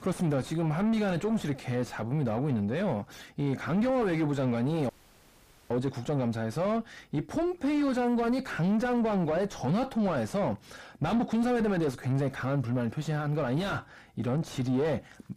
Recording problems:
distortion; heavy; 6 dB below the speech
audio cutting out; at 5 s for 1 s

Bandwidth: 15 kHz